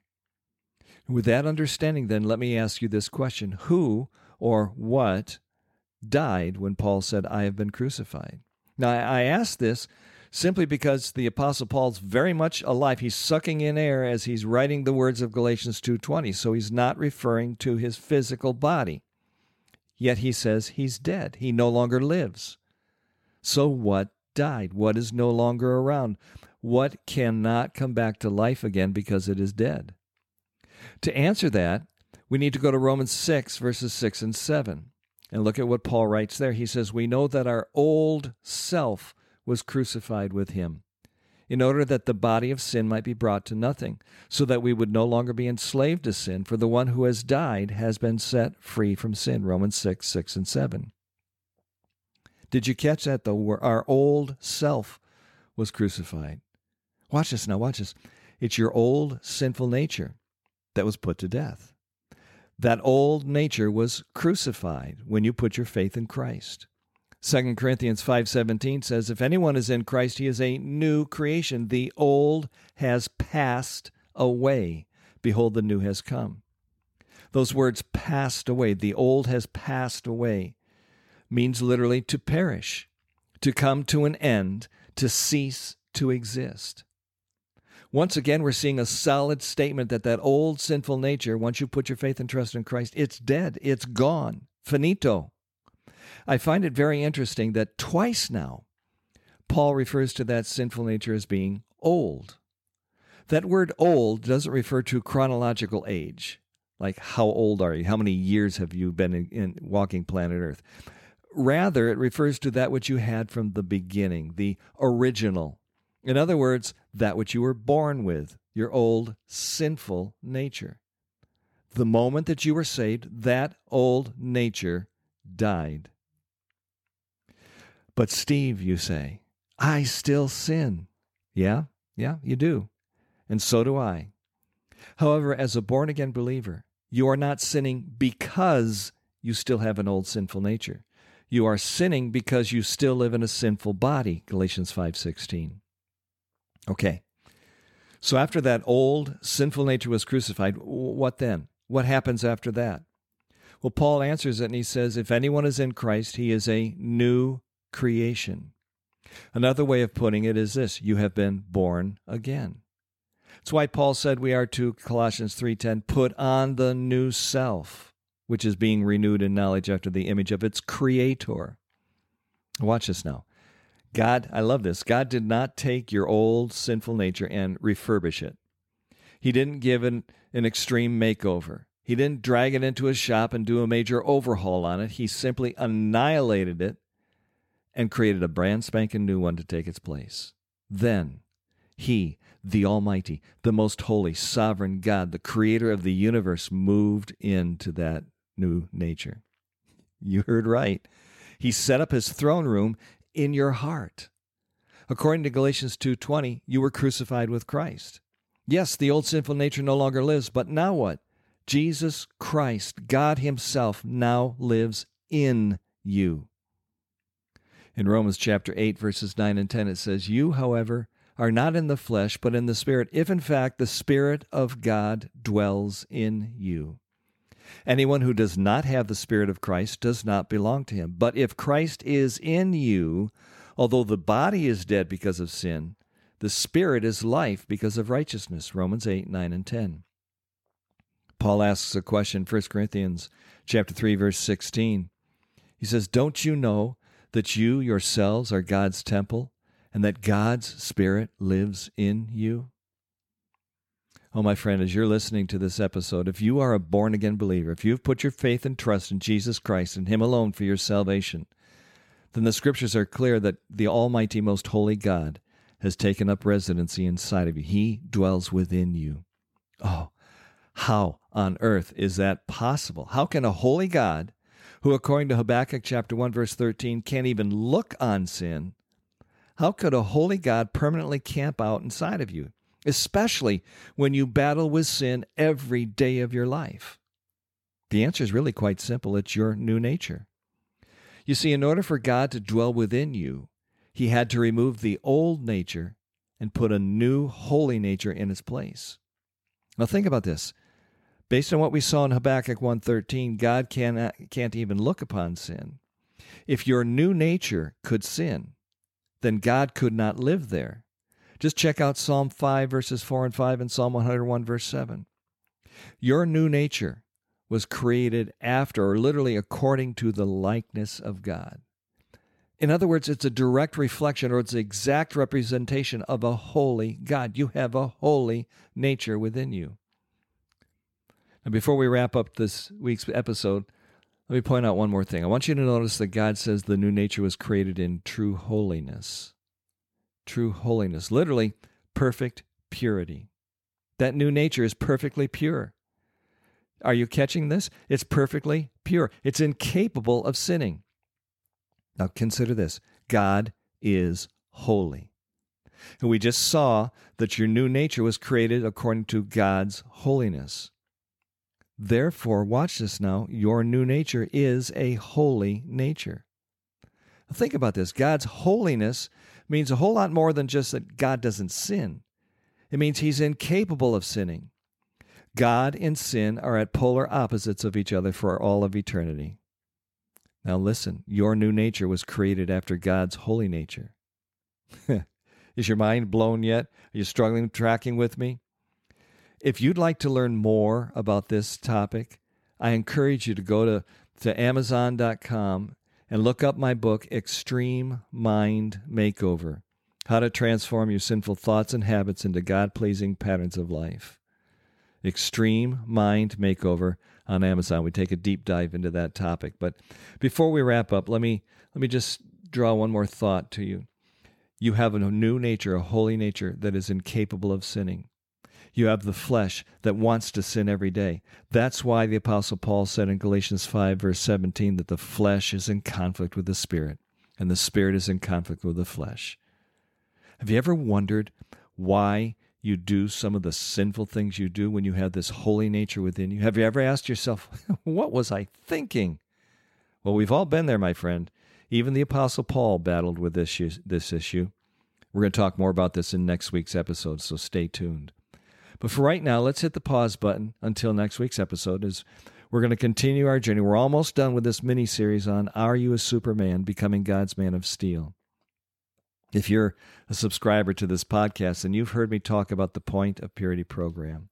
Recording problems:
none

